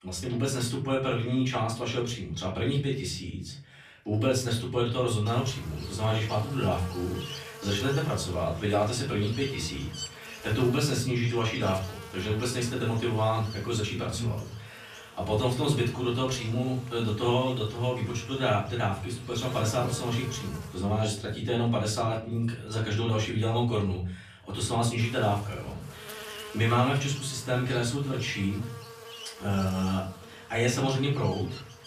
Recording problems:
off-mic speech; far
room echo; slight; dies away in 0.5 s
electrical hum; noticeable; from 5.5 to 21 s and from 25 s on; 50 Hz, 15 dB below the speech

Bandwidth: 14.5 kHz